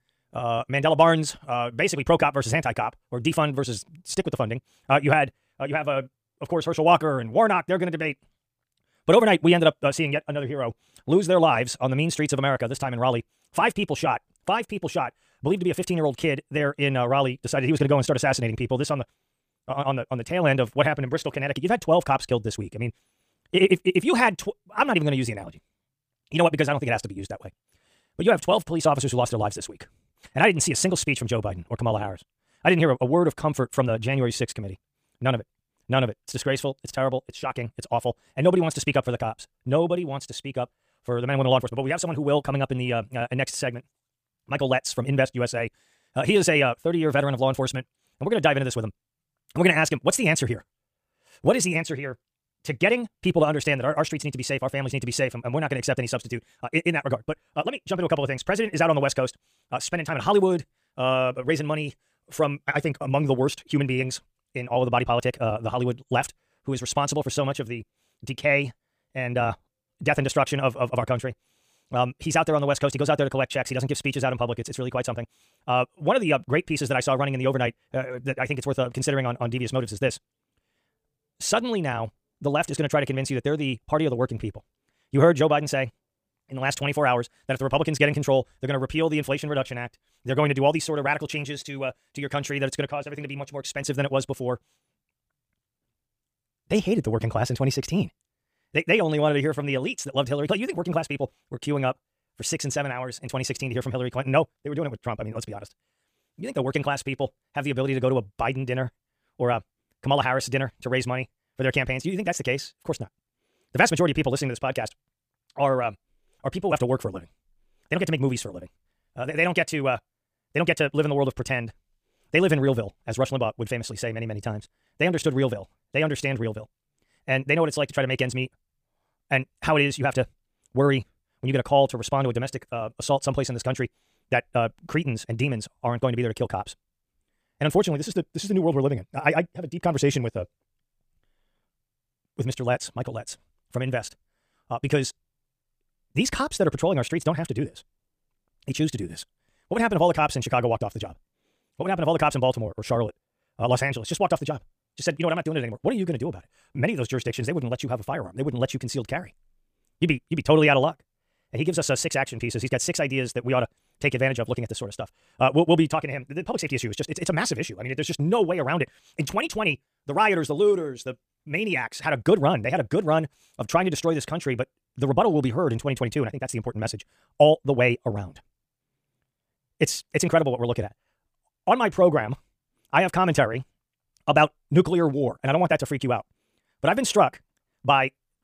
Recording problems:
wrong speed, natural pitch; too fast; 1.7 times normal speed

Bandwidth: 15 kHz